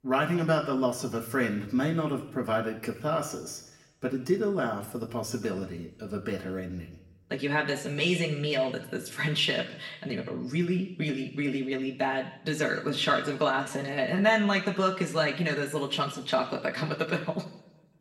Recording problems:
room echo; slight; dies away in 0.8 s
off-mic speech; somewhat distant

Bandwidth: 16 kHz